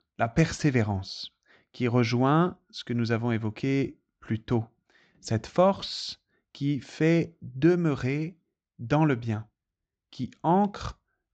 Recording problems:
high frequencies cut off; noticeable; nothing above 8 kHz

